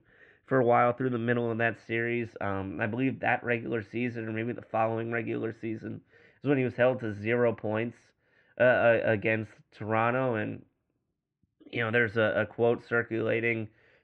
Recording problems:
muffled; very; fading above 2.5 kHz

